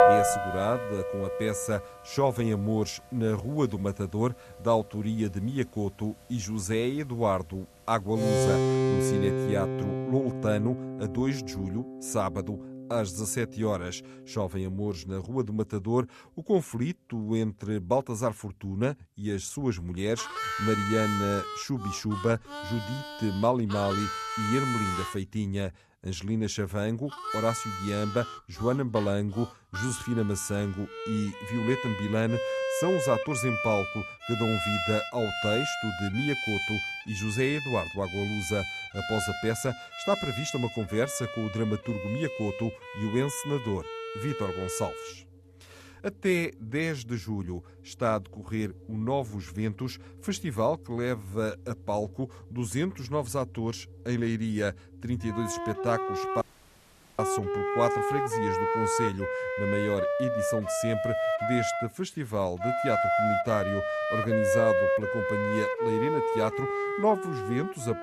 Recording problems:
background music; loud; throughout; as loud as the speech
audio cutting out; at 56 s for 1 s

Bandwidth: 13.5 kHz